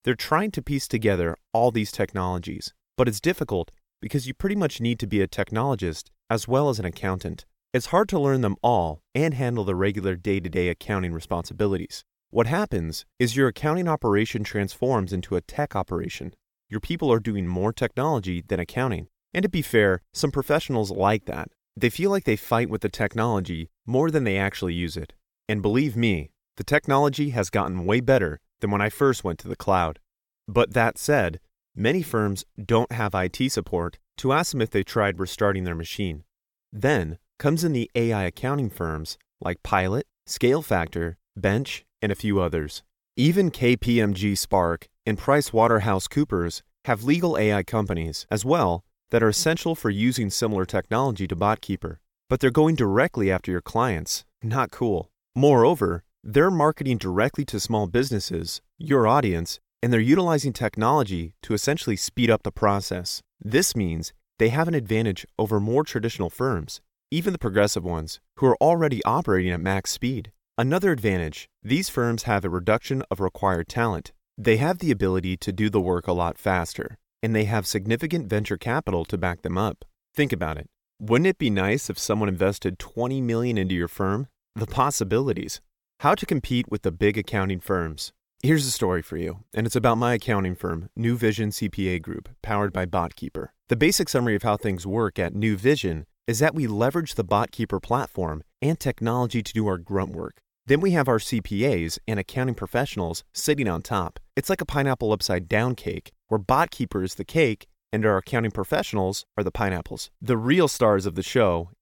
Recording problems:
none

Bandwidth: 17 kHz